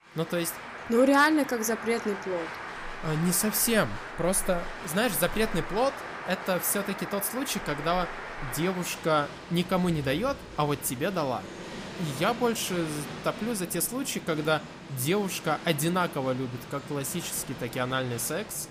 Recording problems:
crowd noise; noticeable; throughout; 10 dB below the speech

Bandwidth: 15 kHz